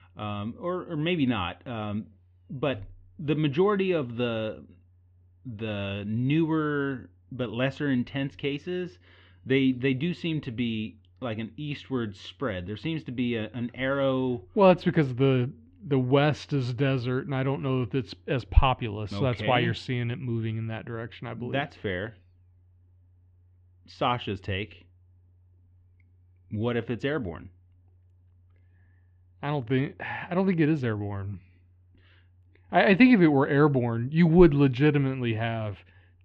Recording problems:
muffled; very; fading above 3 kHz

